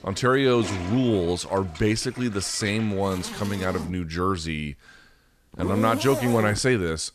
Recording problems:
household noises; noticeable; throughout; 10 dB below the speech

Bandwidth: 14 kHz